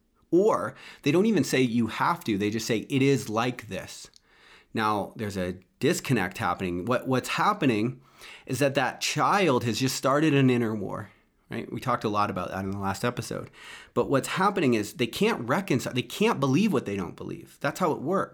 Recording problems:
none

